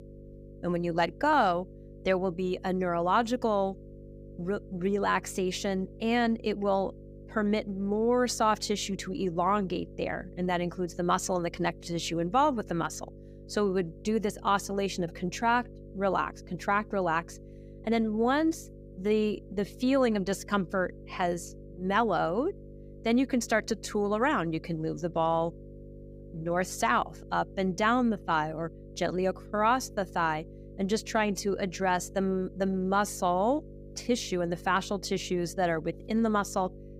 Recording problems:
electrical hum; faint; throughout; 50 Hz, 25 dB below the speech

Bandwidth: 15.5 kHz